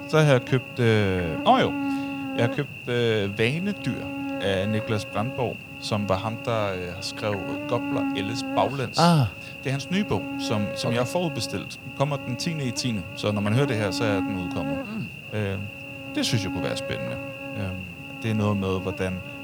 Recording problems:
electrical hum; loud; throughout; 50 Hz, 6 dB below the speech

